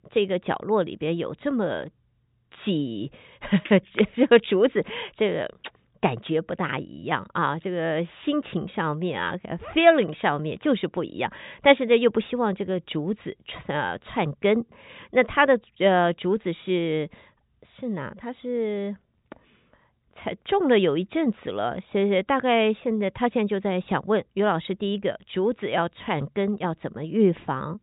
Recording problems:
high frequencies cut off; severe; nothing above 4 kHz

